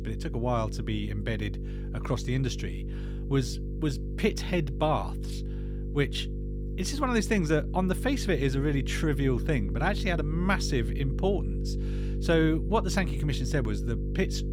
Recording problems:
electrical hum; noticeable; throughout; 50 Hz, 15 dB below the speech

